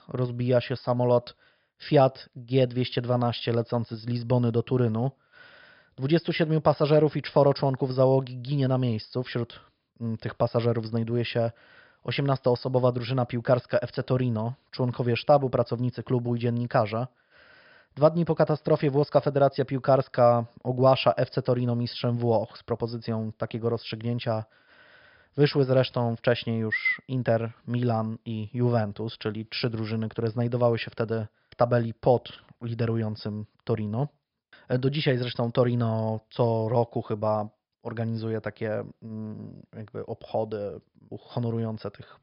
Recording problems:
high frequencies cut off; noticeable; nothing above 5.5 kHz

